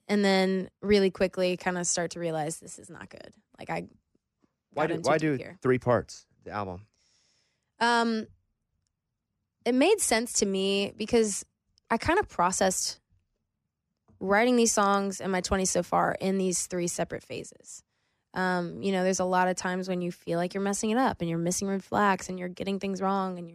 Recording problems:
none

